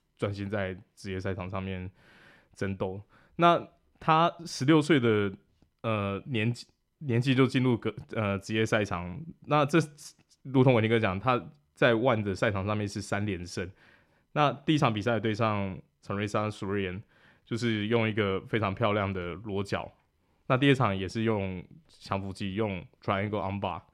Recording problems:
none

